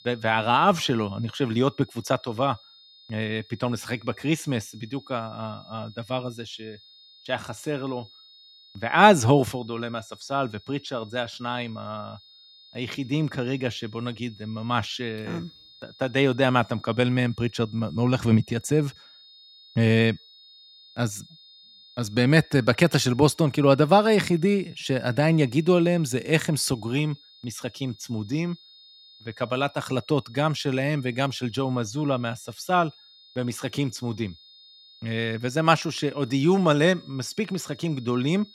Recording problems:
high-pitched whine; faint; throughout; 3.5 kHz, 25 dB below the speech

